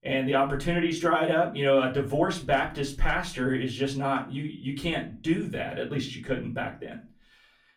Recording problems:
off-mic speech; far
room echo; very slight; dies away in 0.3 s

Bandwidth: 16 kHz